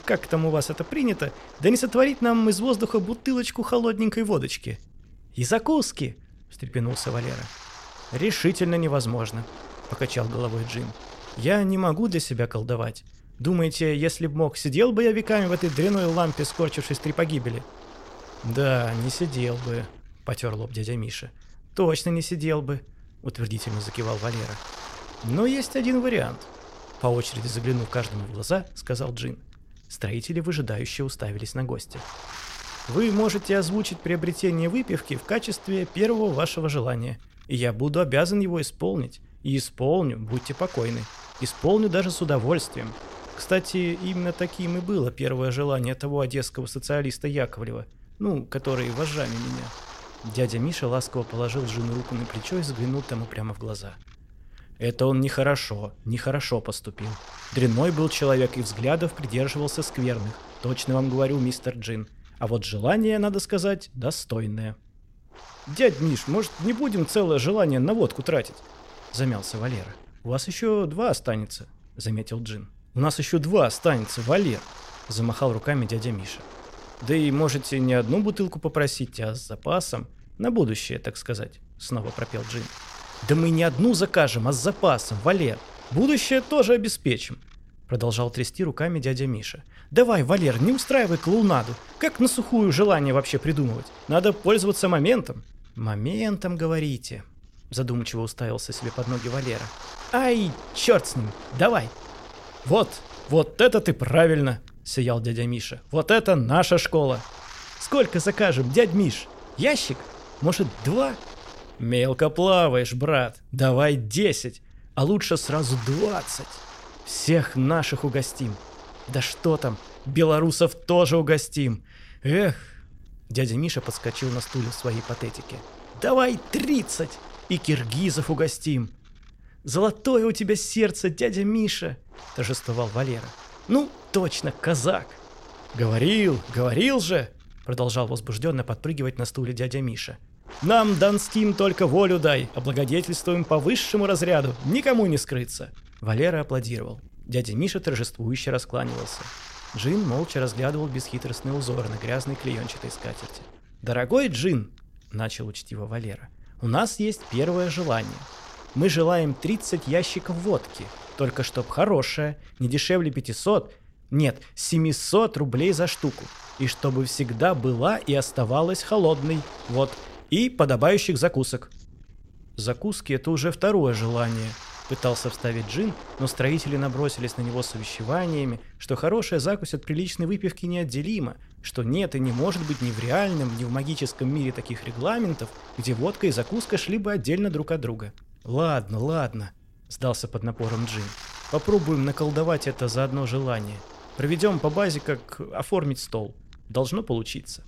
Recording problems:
wind noise on the microphone; occasional gusts; 15 dB below the speech

